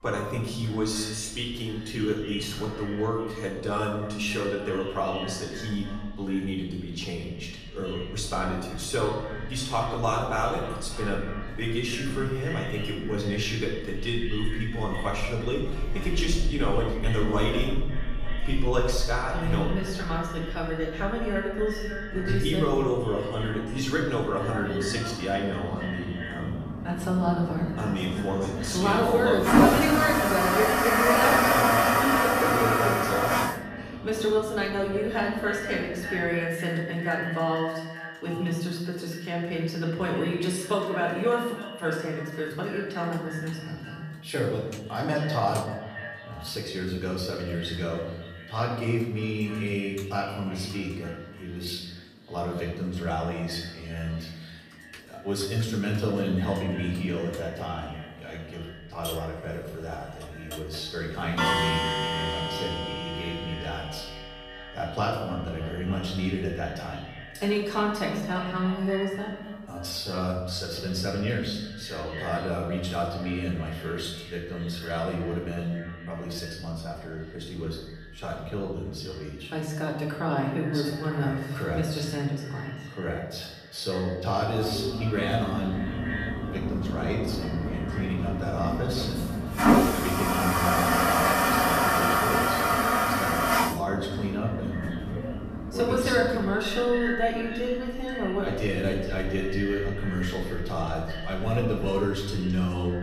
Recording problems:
echo of what is said; strong; throughout; 290 ms later, 10 dB below the speech
off-mic speech; far
room echo; noticeable; dies away in 0.9 s
household noises; very loud; throughout; 1 dB above the speech

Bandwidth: 14.5 kHz